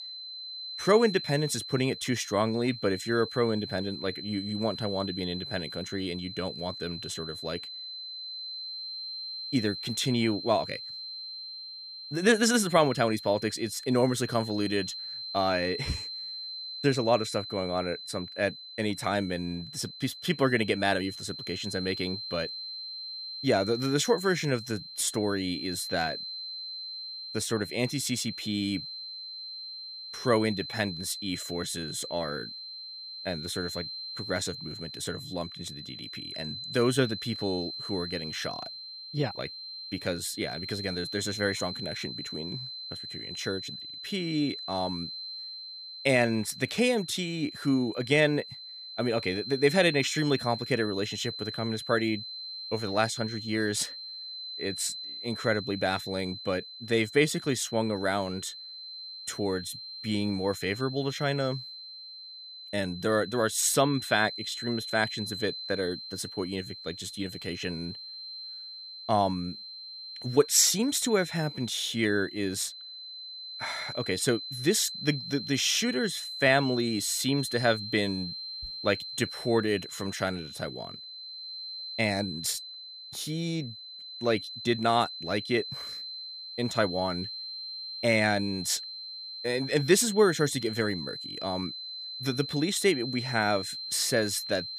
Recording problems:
high-pitched whine; loud; throughout; 4 kHz, 8 dB below the speech

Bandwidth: 15 kHz